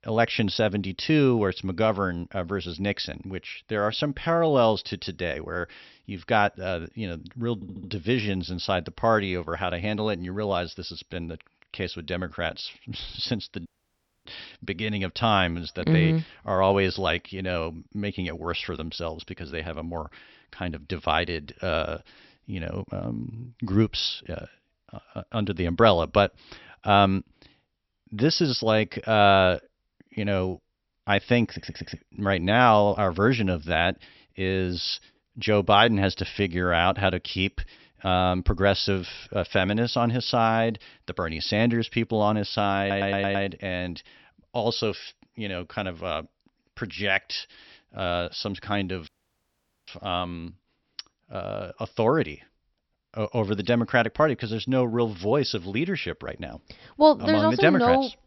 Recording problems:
high frequencies cut off; noticeable; nothing above 5.5 kHz
audio stuttering; at 7.5 s, at 32 s and at 43 s
audio cutting out; at 14 s for 0.5 s and at 49 s for 1 s

